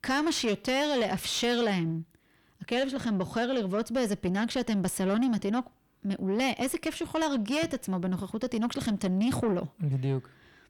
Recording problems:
distortion; slight; 10 dB below the speech

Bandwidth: 18.5 kHz